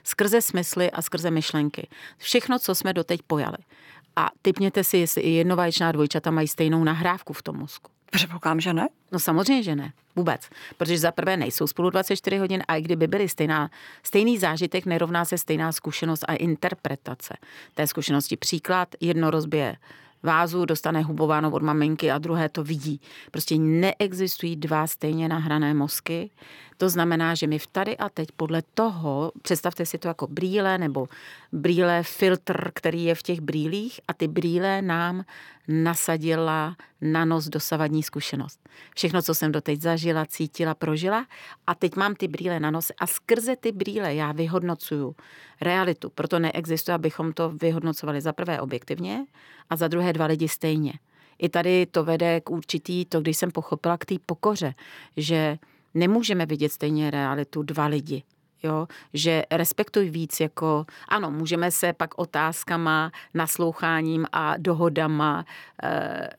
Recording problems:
none

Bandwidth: 17 kHz